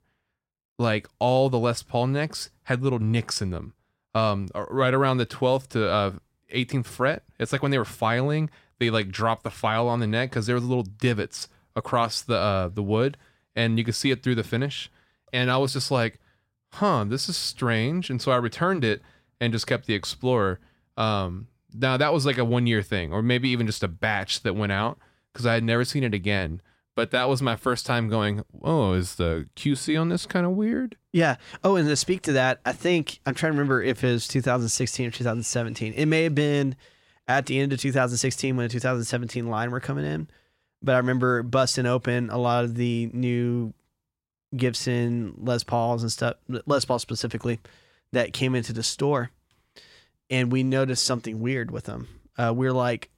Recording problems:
none

